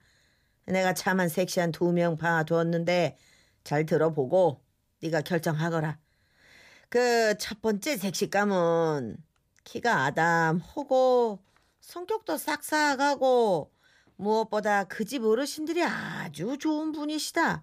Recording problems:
none

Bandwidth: 15 kHz